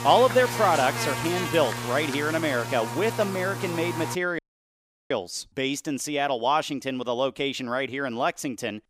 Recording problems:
electrical hum; loud; until 4 s; 60 Hz, 6 dB below the speech
audio cutting out; at 4.5 s for 0.5 s

